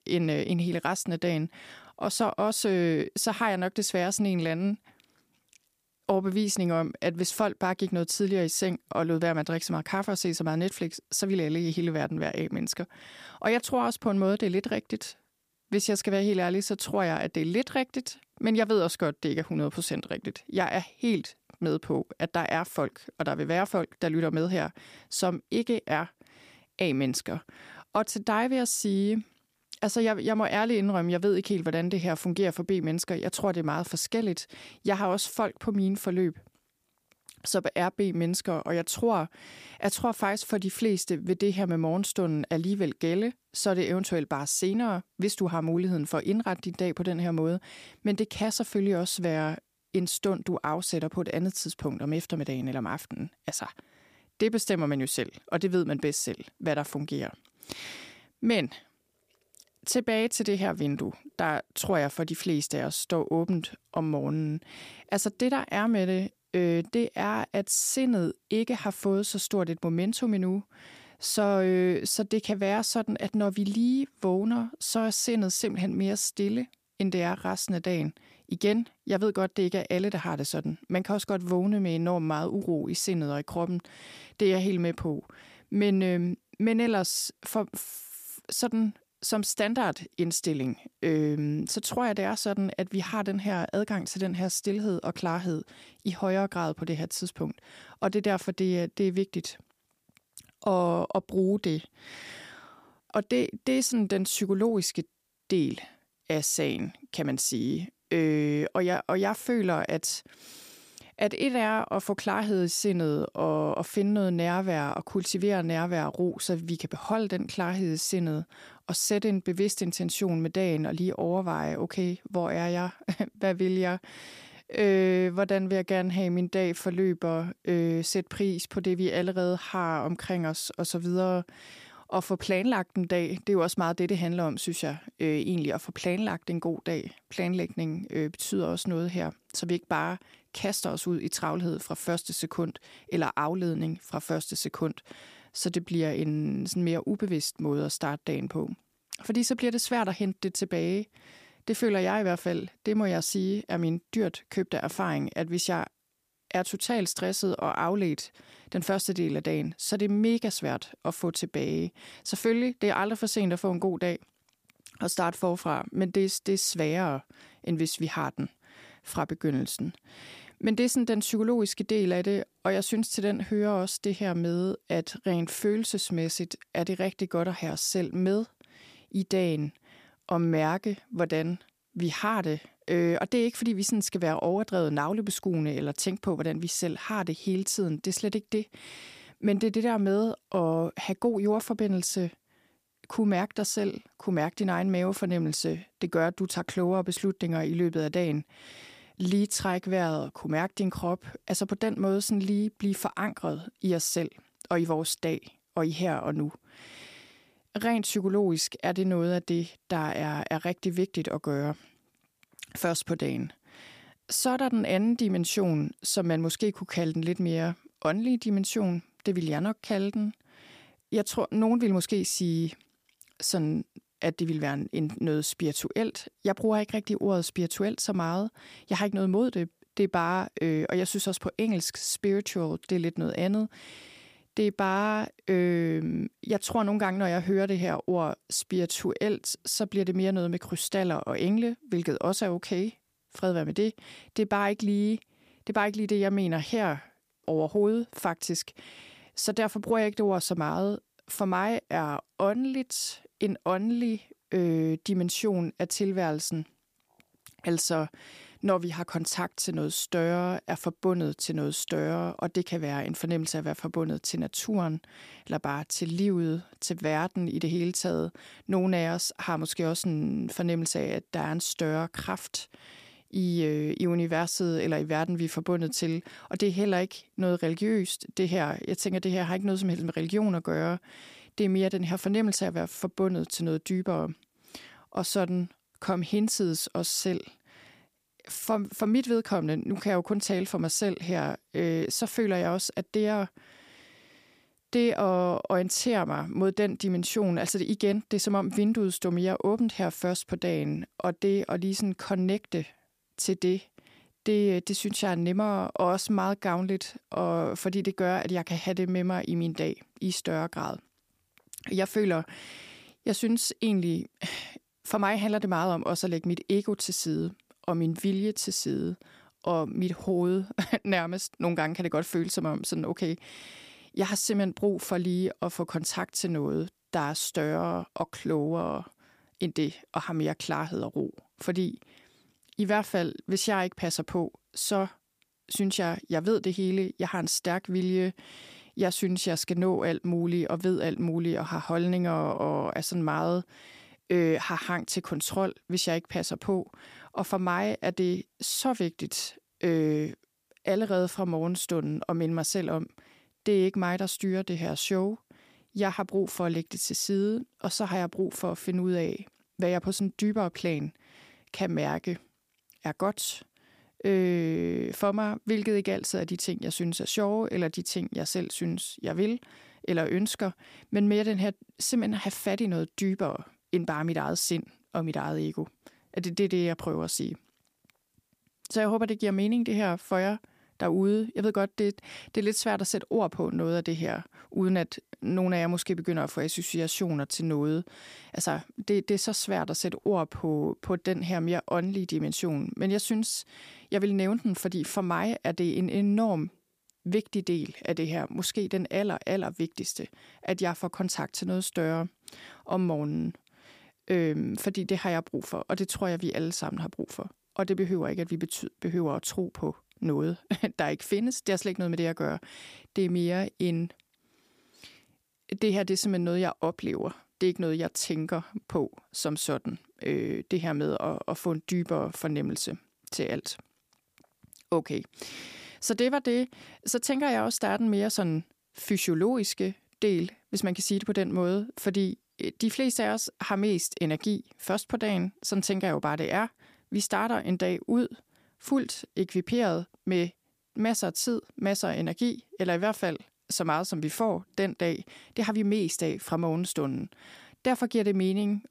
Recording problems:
none

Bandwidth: 15 kHz